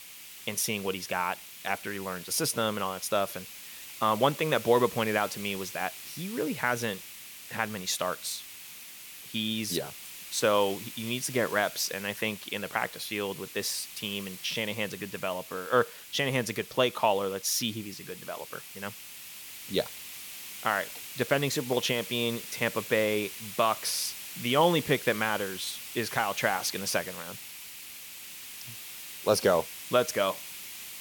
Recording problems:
hiss; noticeable; throughout; 10 dB below the speech

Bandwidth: 18 kHz